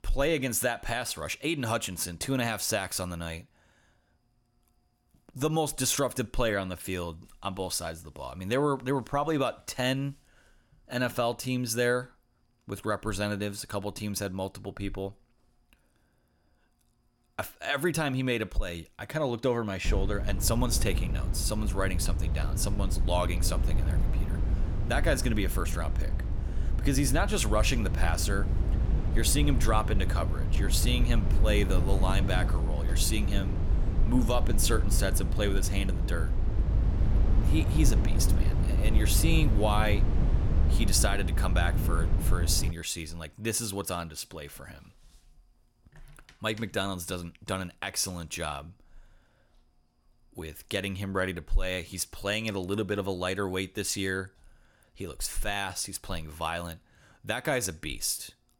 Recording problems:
low rumble; noticeable; from 20 to 43 s; 10 dB below the speech

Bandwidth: 17.5 kHz